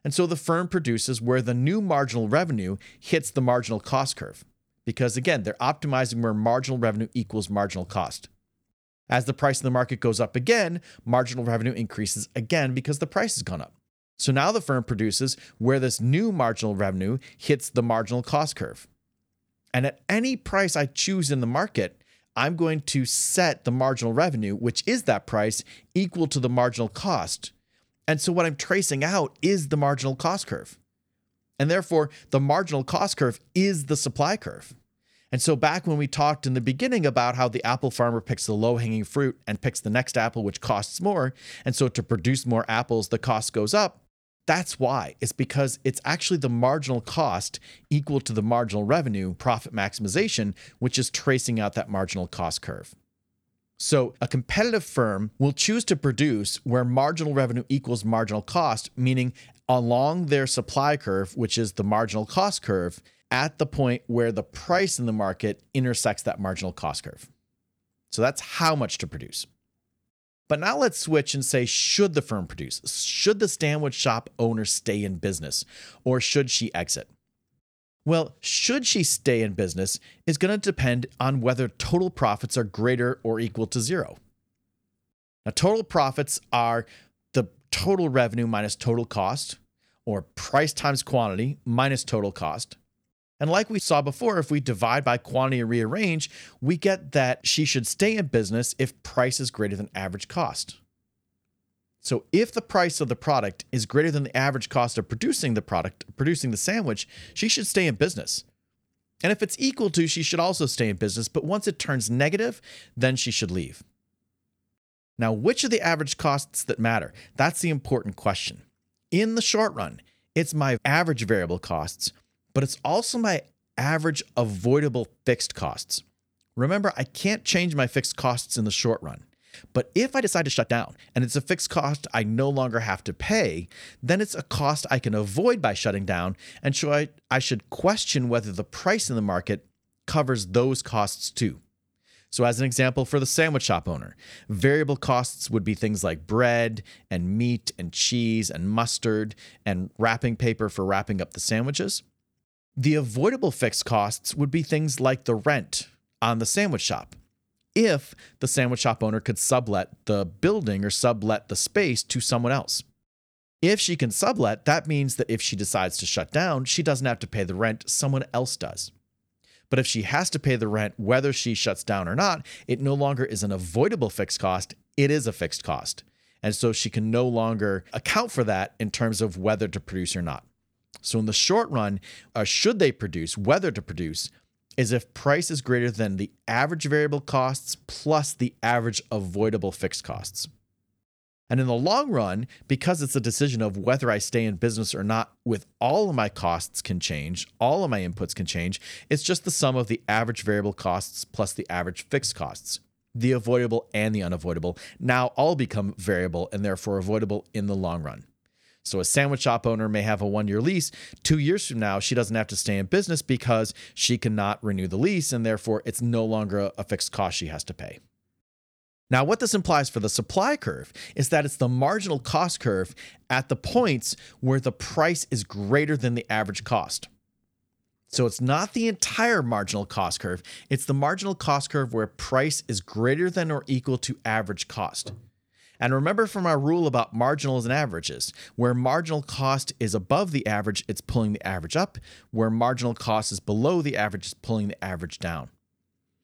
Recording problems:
uneven, jittery; strongly; from 26 s to 4:01

